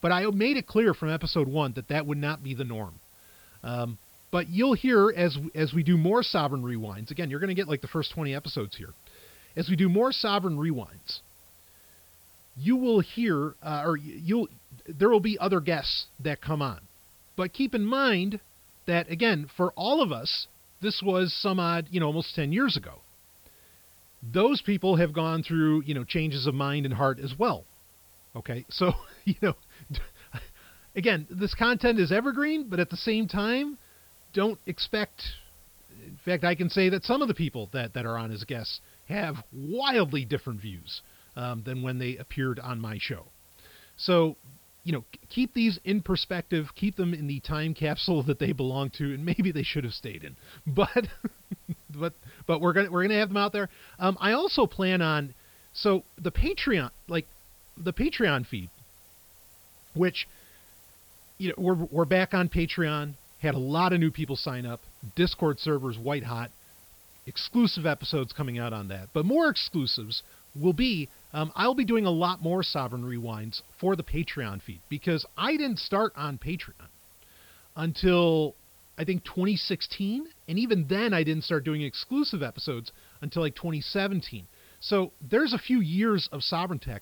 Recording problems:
high frequencies cut off; noticeable; nothing above 5.5 kHz
hiss; faint; throughout; 25 dB below the speech

